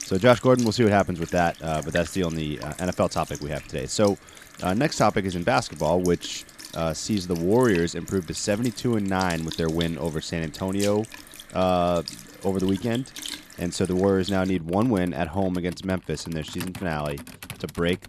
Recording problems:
household noises; noticeable; throughout; 15 dB below the speech

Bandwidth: 14.5 kHz